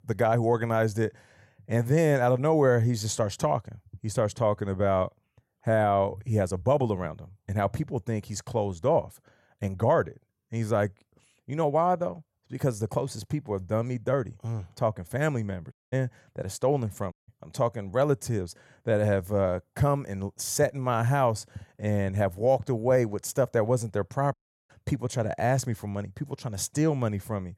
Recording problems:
audio cutting out; at 16 s, at 17 s and at 24 s

